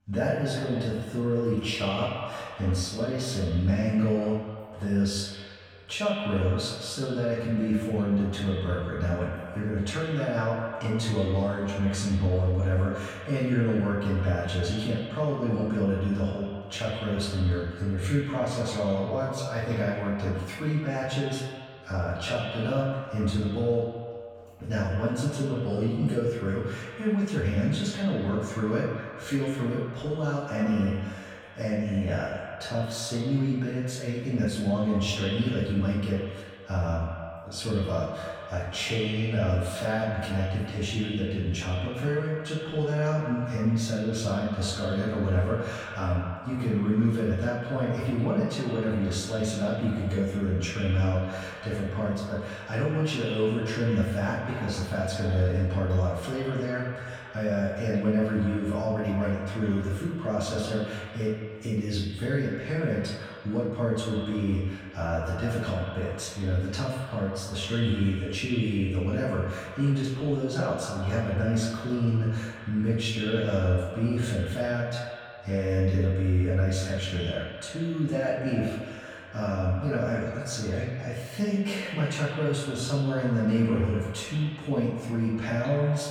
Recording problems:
echo of what is said; strong; throughout; 140 ms later, 10 dB below the speech
off-mic speech; far
room echo; noticeable; dies away in 0.6 s

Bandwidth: 18.5 kHz